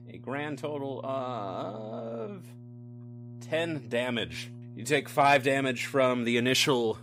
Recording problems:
electrical hum; faint; throughout; 60 Hz, 25 dB below the speech

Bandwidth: 15.5 kHz